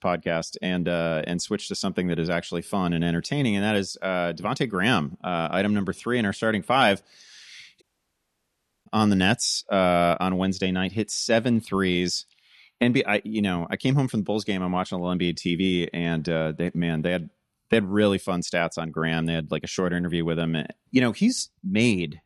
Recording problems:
audio cutting out; at 8 s for 1 s

